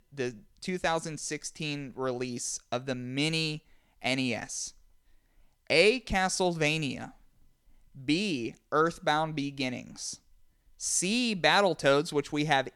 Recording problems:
none

